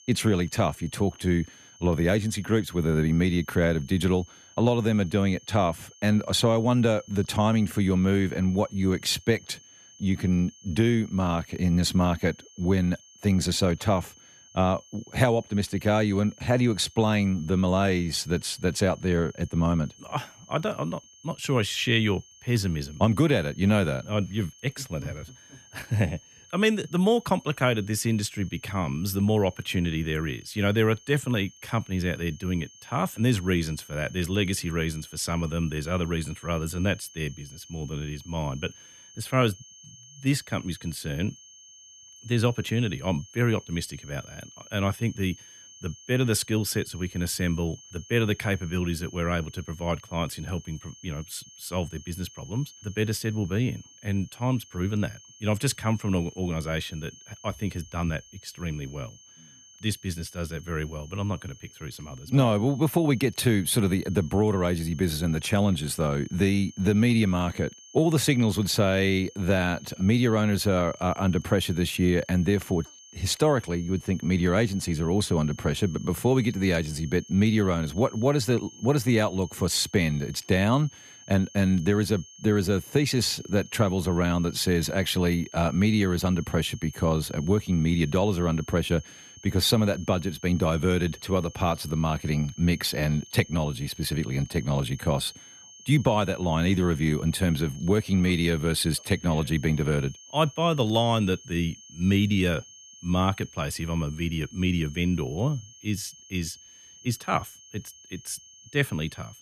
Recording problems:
high-pitched whine; faint; throughout; 6.5 kHz, 20 dB below the speech

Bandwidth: 14.5 kHz